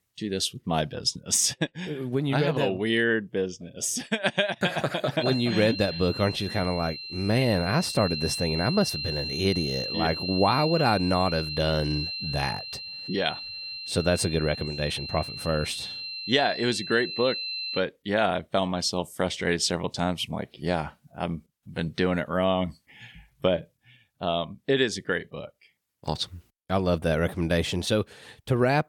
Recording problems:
high-pitched whine; loud; from 5 to 18 s; 4 kHz, 6 dB below the speech

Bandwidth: 17.5 kHz